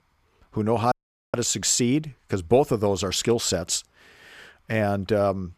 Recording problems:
audio cutting out; at 1 s

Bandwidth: 14.5 kHz